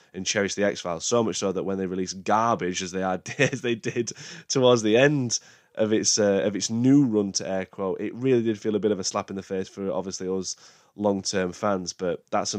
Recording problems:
abrupt cut into speech; at the end

